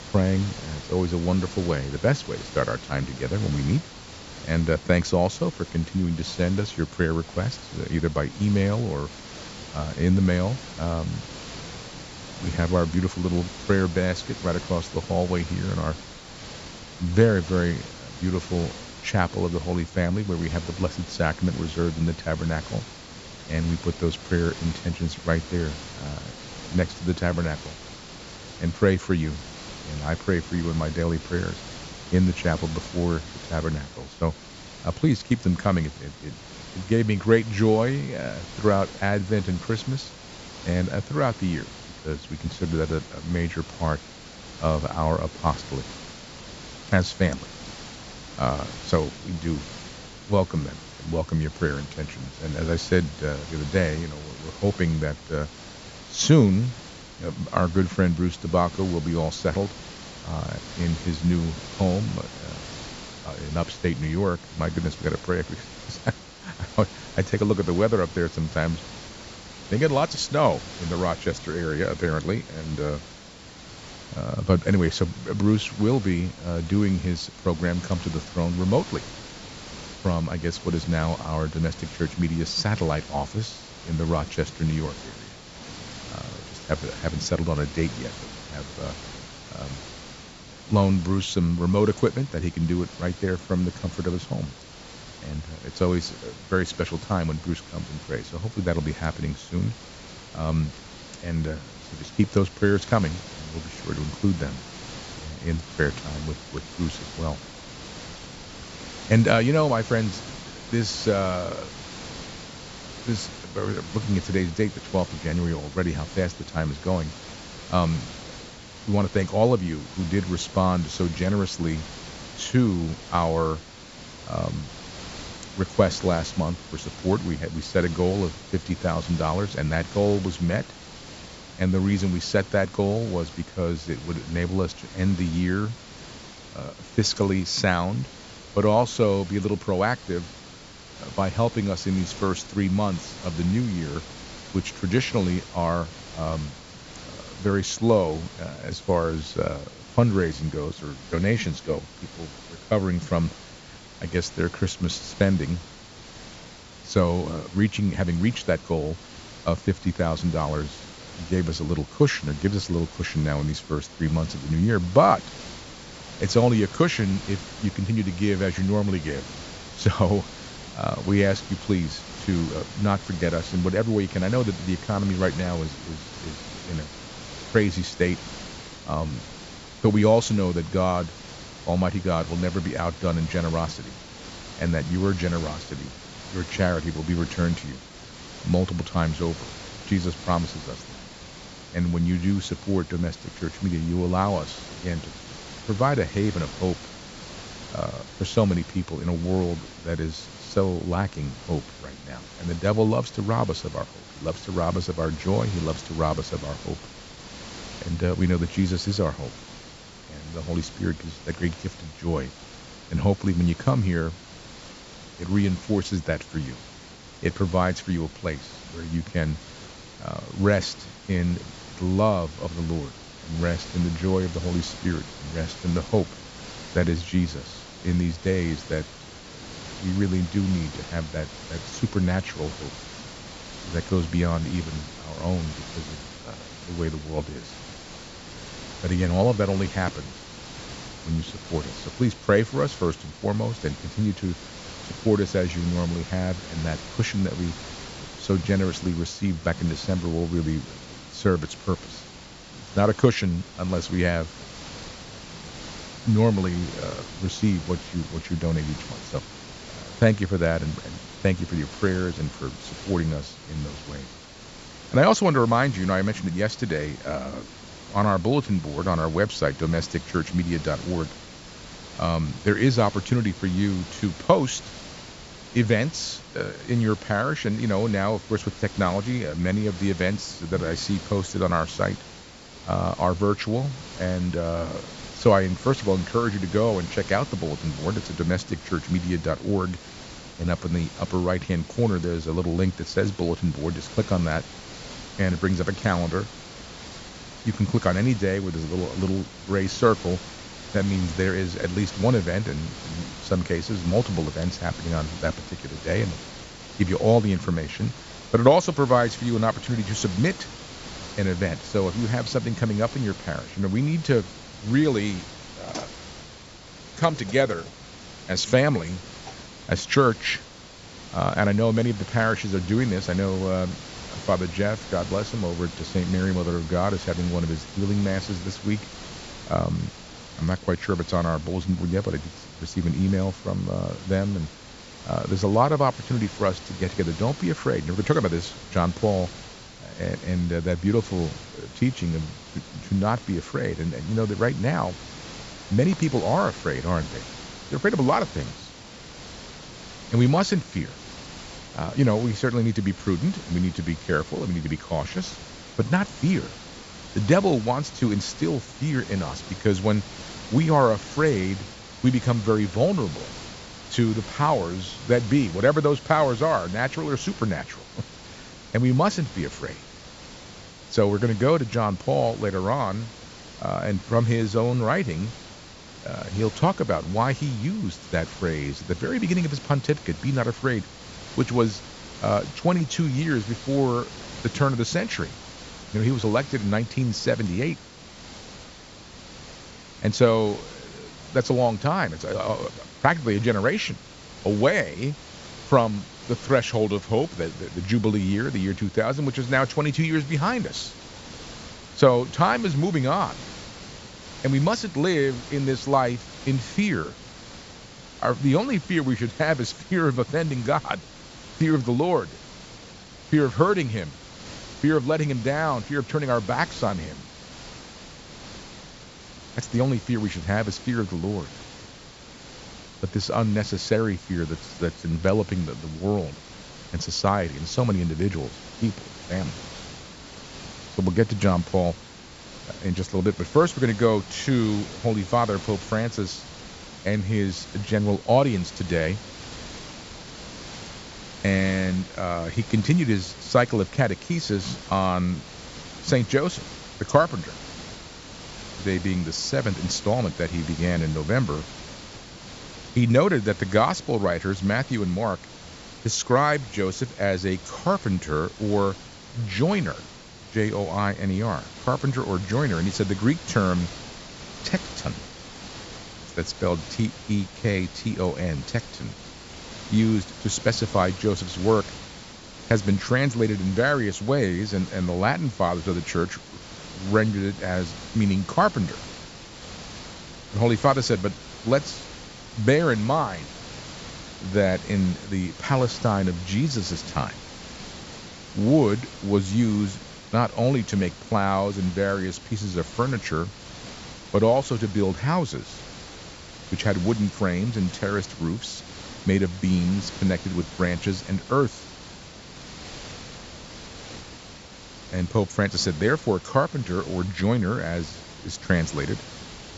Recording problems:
high frequencies cut off; noticeable; nothing above 8 kHz
hiss; noticeable; throughout; 15 dB below the speech

